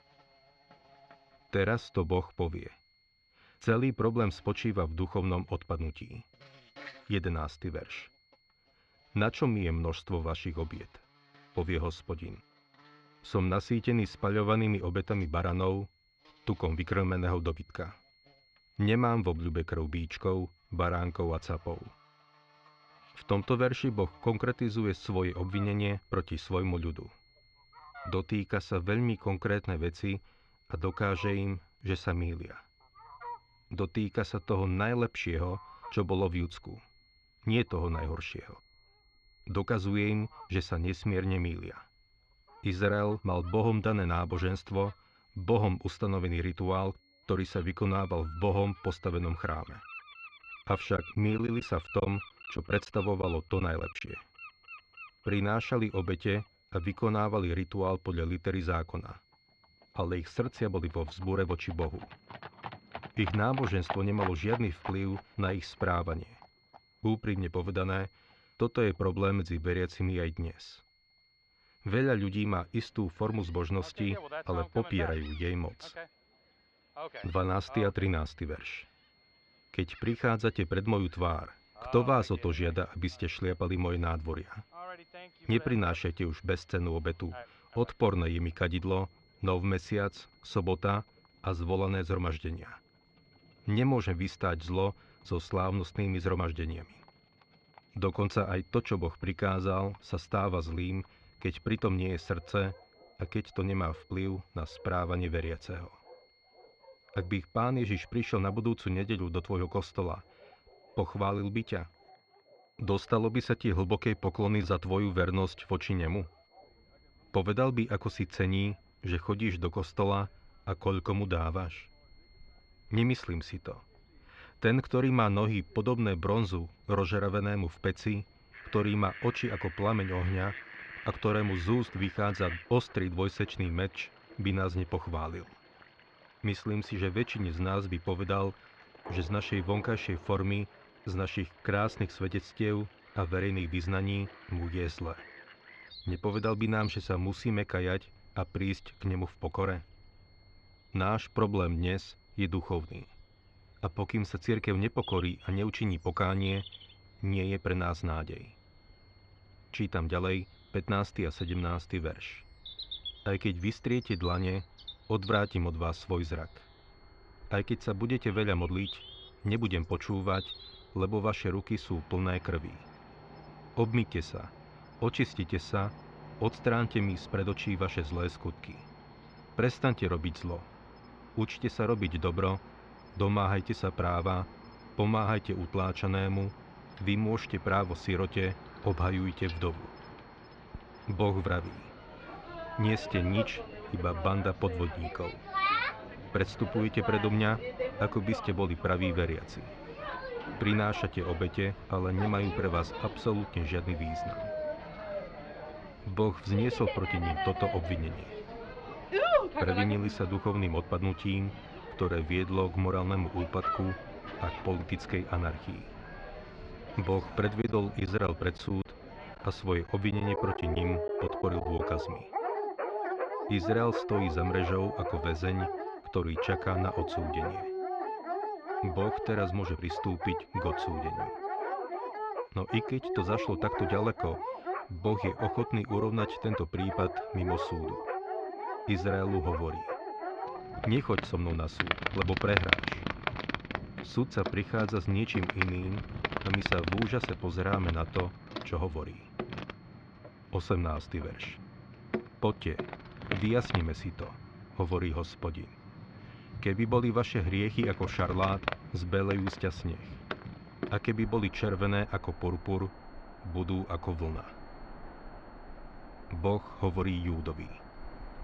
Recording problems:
muffled; slightly; fading above 3.5 kHz
animal sounds; loud; throughout; 8 dB below the speech
high-pitched whine; faint; throughout; 4.5 kHz, 35 dB below the speech
choppy; very; from 51 to 54 s and from 3:38 to 3:42; 7% of the speech affected

